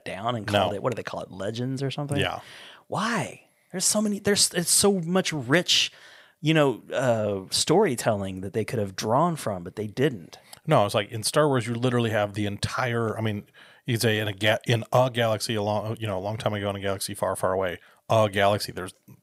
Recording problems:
none

